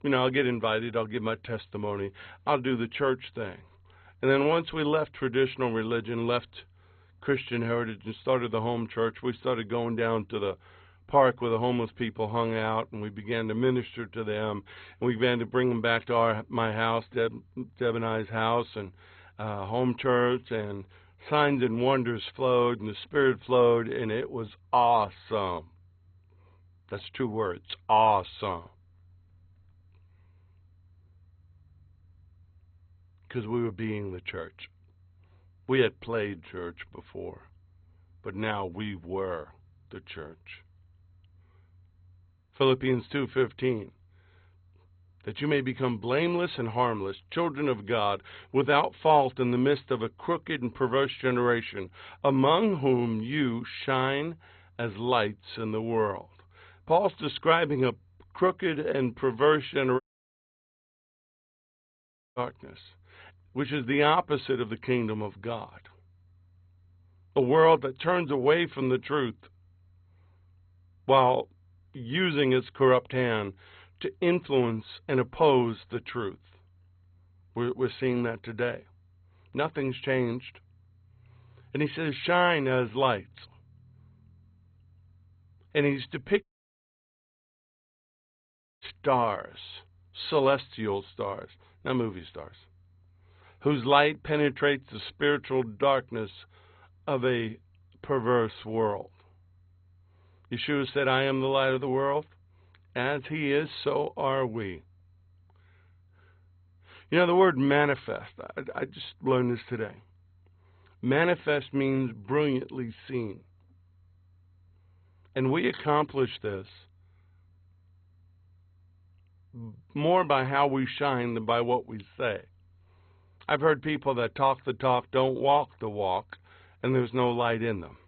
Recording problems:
garbled, watery; badly; nothing above 4 kHz
audio cutting out; at 1:00 for 2.5 s and at 1:26 for 2.5 s

